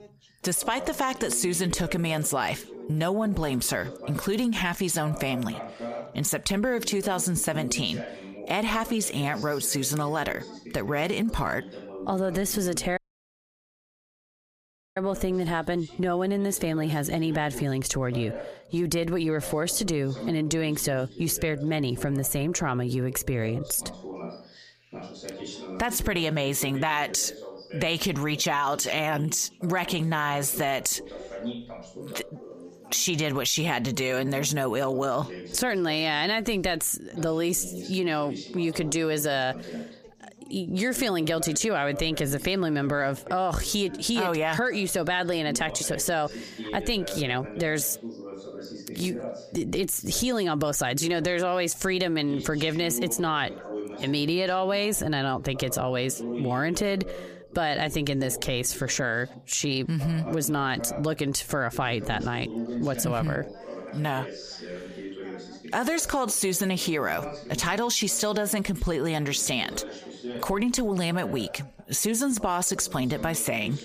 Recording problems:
squashed, flat; heavily, background pumping
background chatter; noticeable; throughout; 2 voices, 15 dB below the speech
audio cutting out; at 13 s for 2 s

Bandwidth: 15 kHz